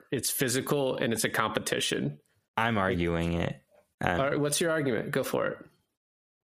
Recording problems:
squashed, flat; heavily

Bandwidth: 15 kHz